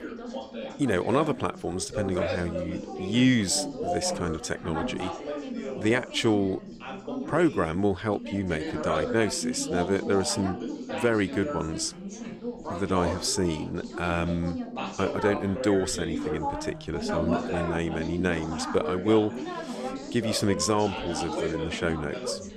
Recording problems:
background chatter; loud; throughout; 3 voices, 6 dB below the speech

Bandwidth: 15.5 kHz